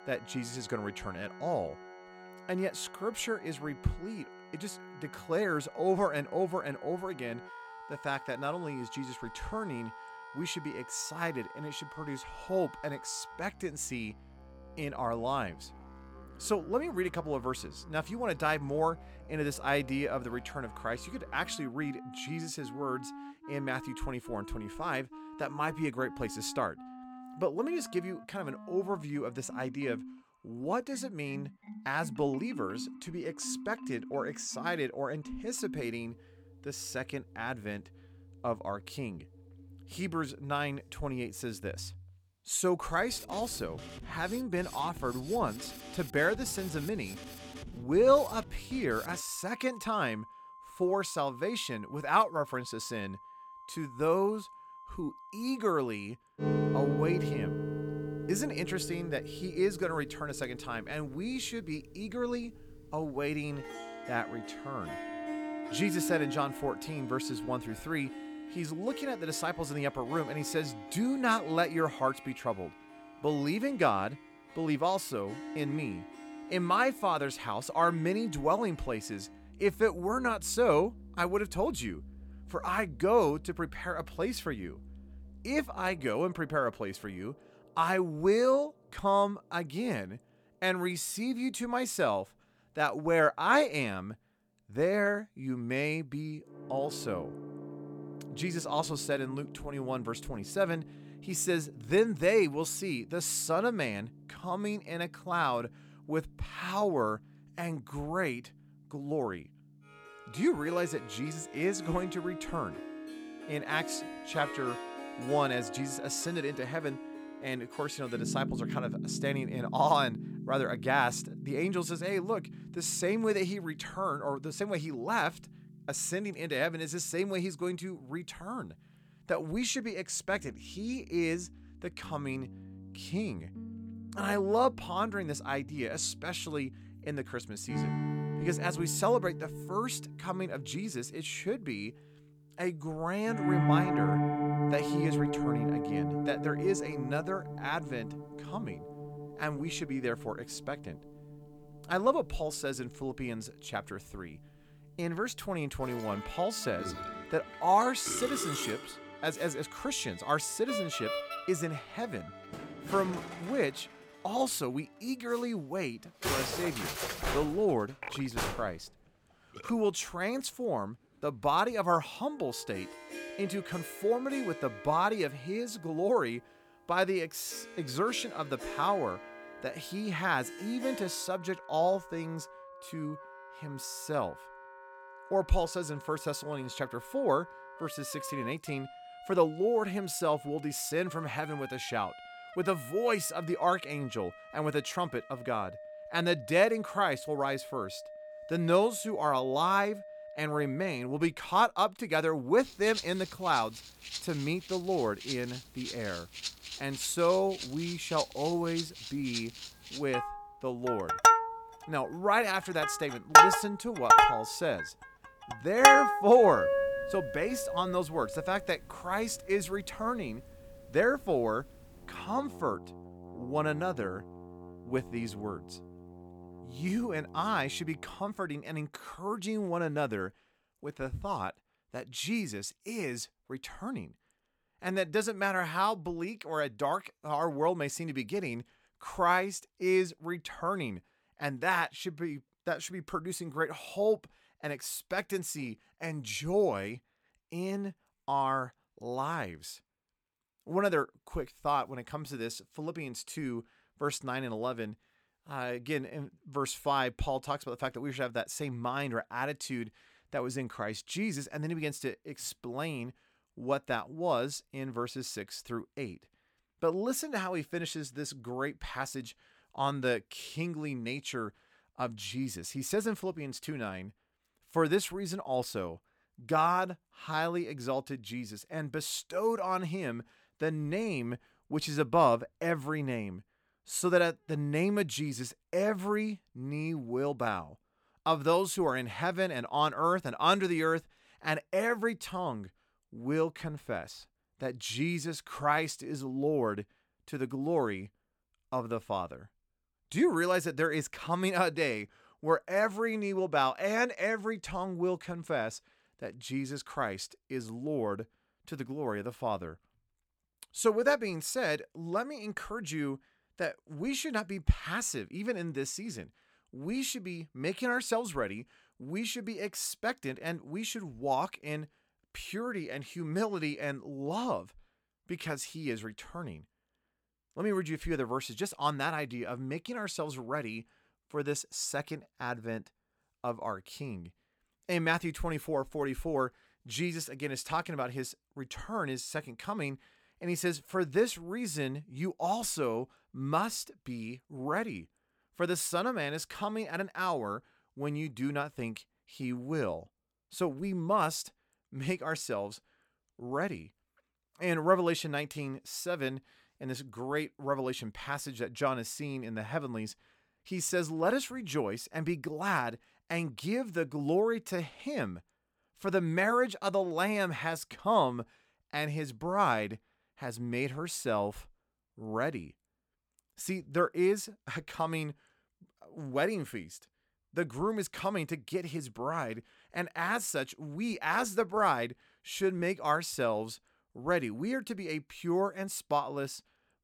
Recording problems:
background music; loud; until 3:48; 3 dB below the speech

